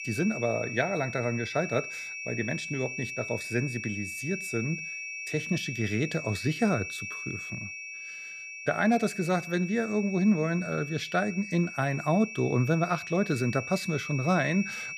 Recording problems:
high-pitched whine; loud; throughout; 2.5 kHz, 7 dB below the speech

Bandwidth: 15 kHz